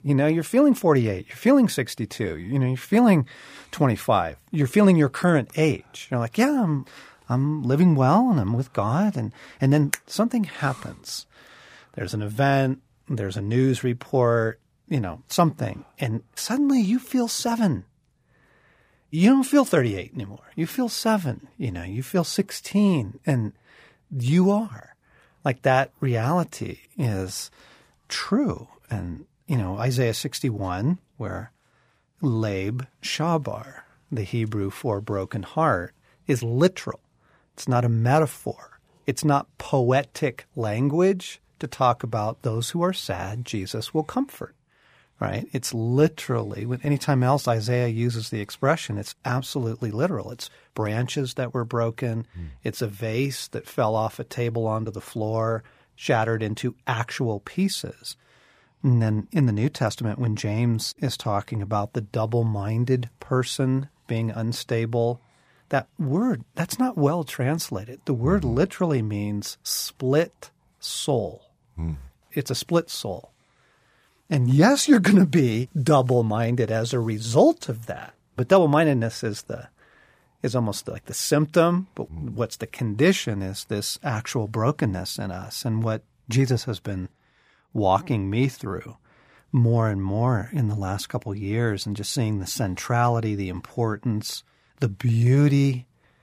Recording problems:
none

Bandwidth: 15 kHz